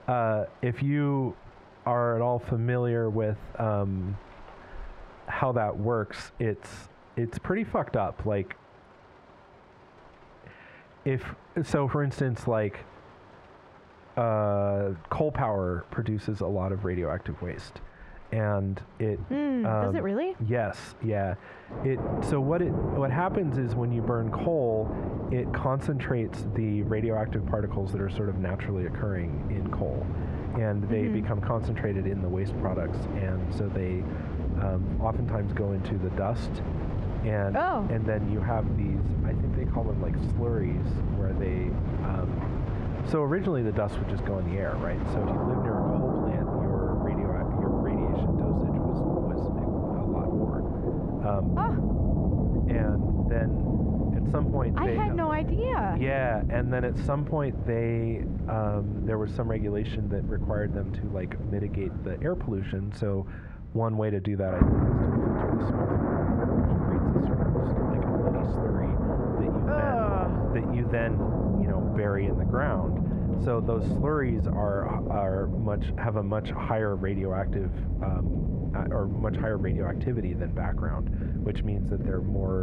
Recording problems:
muffled; slightly; fading above 3 kHz
squashed, flat; somewhat, background pumping
rain or running water; very loud; throughout; as loud as the speech
abrupt cut into speech; at the end

